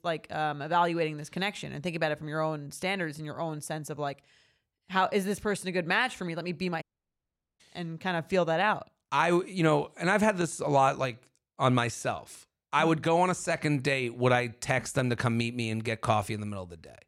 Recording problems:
audio cutting out; at 7 s for 1 s

